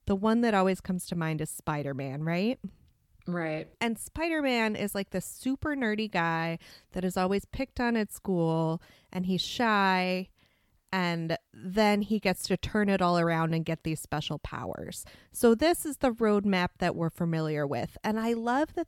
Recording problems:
none

